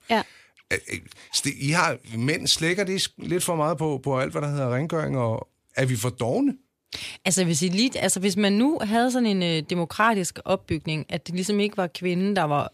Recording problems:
none

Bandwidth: 14.5 kHz